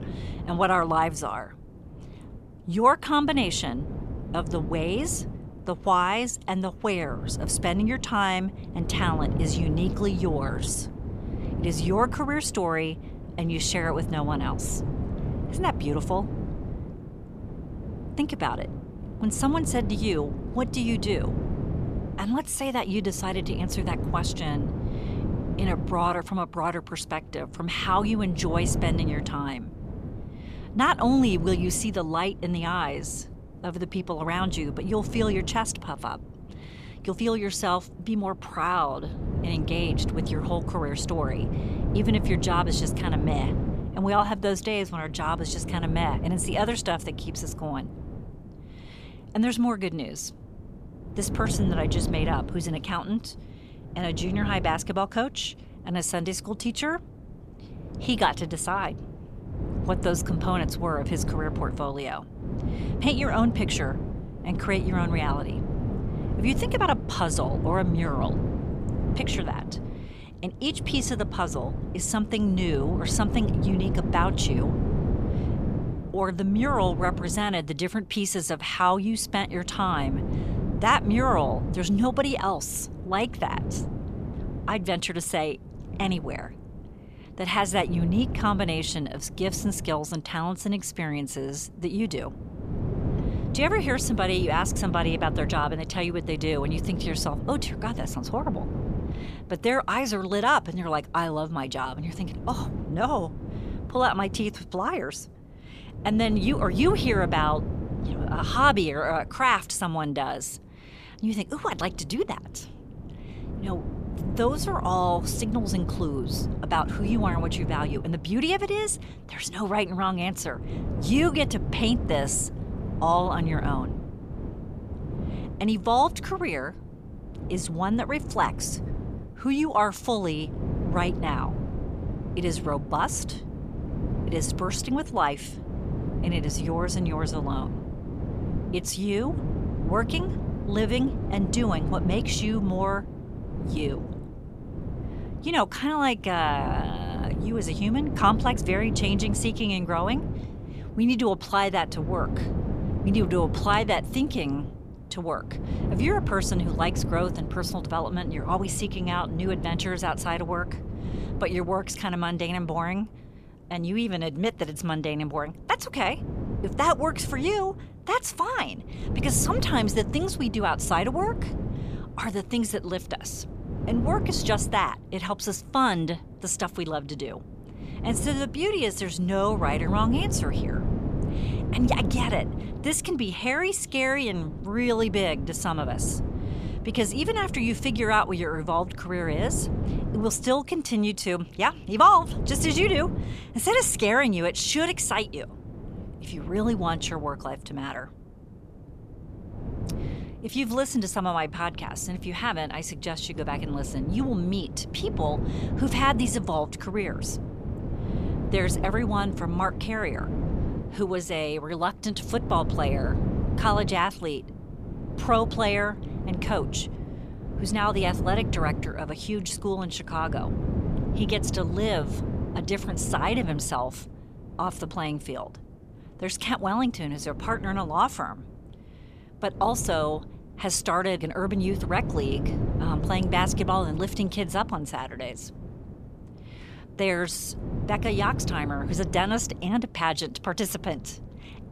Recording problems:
wind noise on the microphone; occasional gusts; 10 dB below the speech

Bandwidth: 14.5 kHz